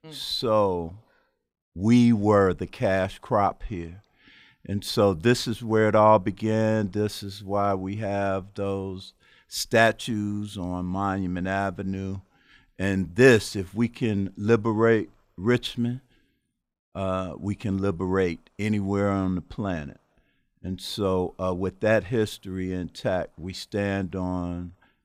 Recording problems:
none

